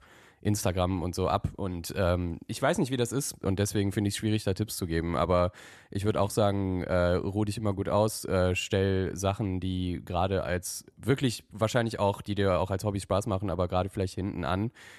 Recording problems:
none

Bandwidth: 13.5 kHz